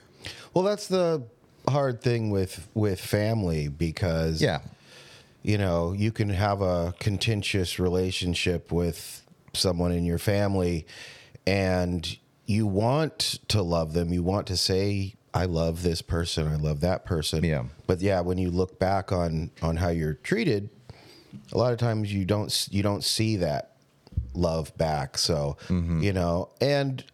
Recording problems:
squashed, flat; somewhat

